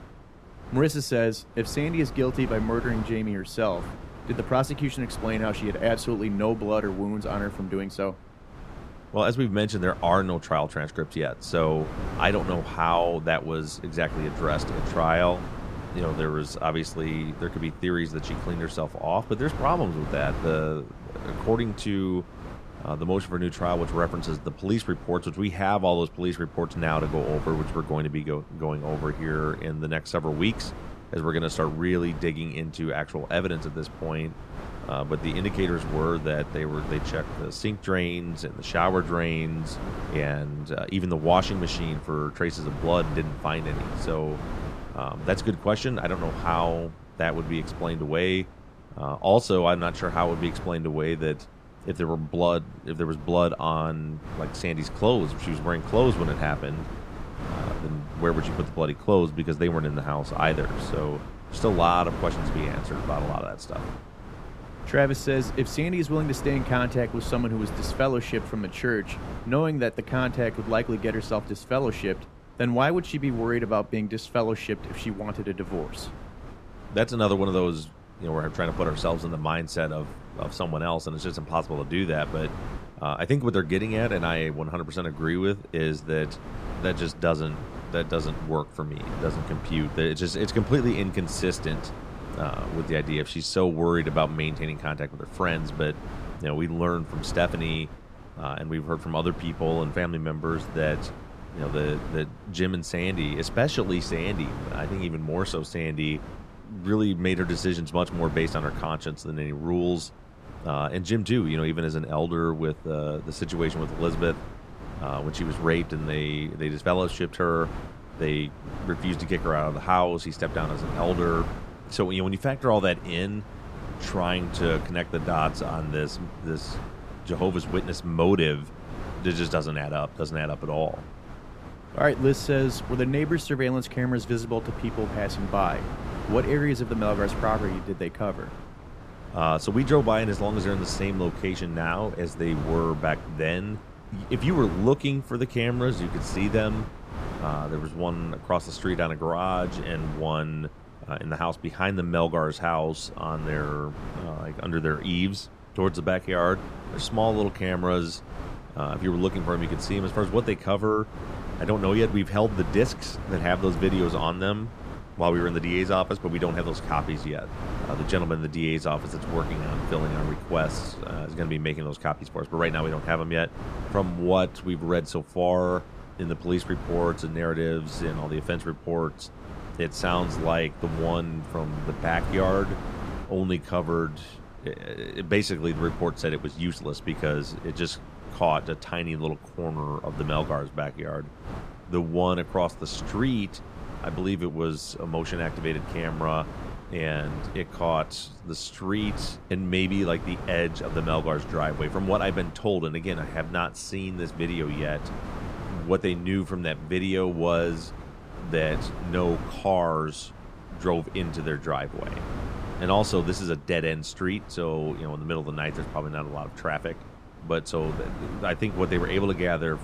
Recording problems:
wind noise on the microphone; occasional gusts; 15 dB below the speech

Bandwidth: 14.5 kHz